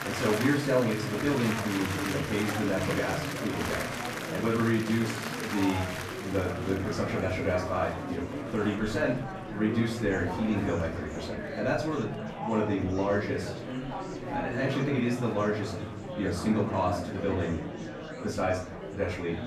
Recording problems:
off-mic speech; far
room echo; slight; dies away in 0.4 s
murmuring crowd; loud; throughout; 5 dB below the speech

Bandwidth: 14.5 kHz